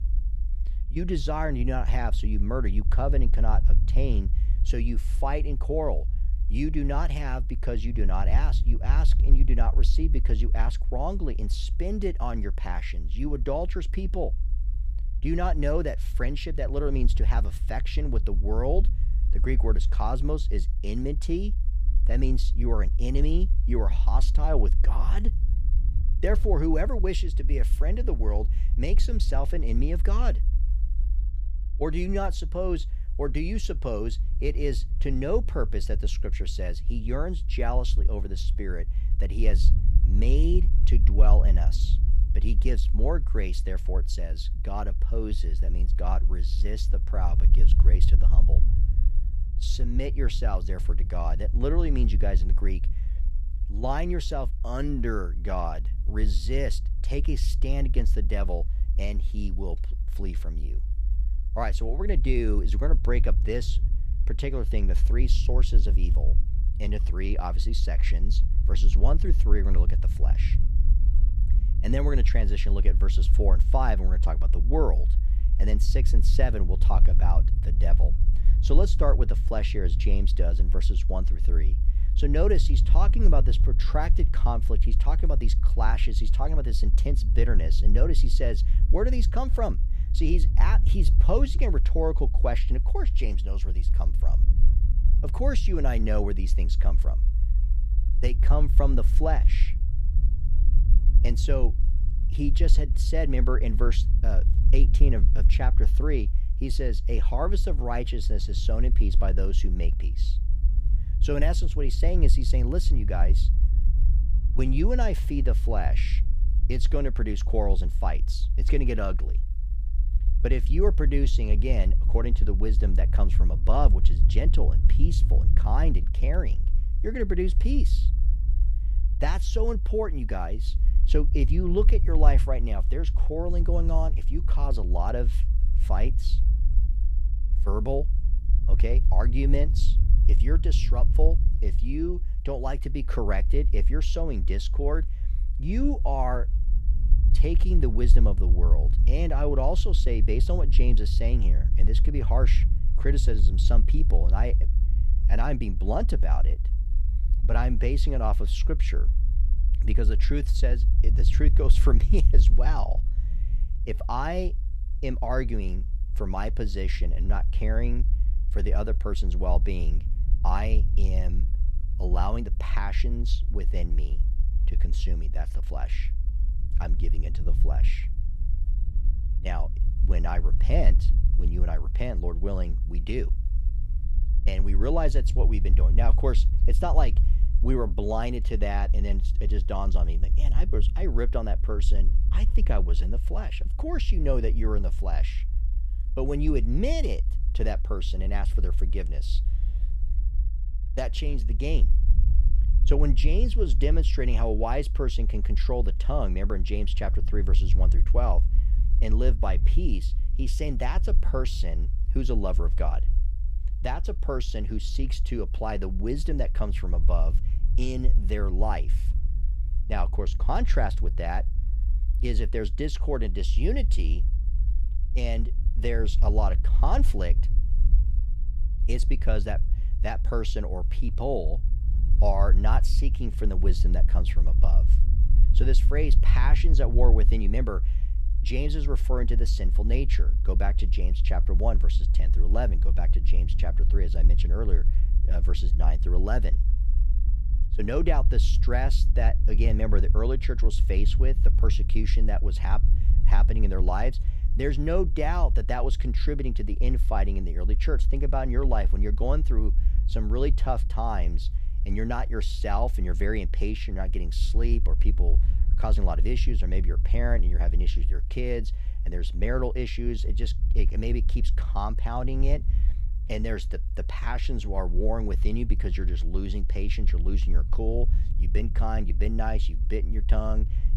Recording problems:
low rumble; noticeable; throughout; 15 dB below the speech

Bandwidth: 15.5 kHz